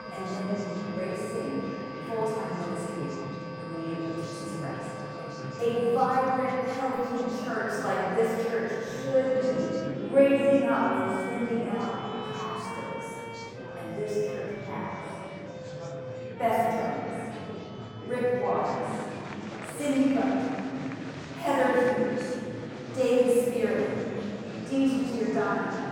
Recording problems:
room echo; strong; dies away in 2.5 s
off-mic speech; far
background music; noticeable; throughout; 15 dB below the speech
murmuring crowd; noticeable; throughout; 10 dB below the speech

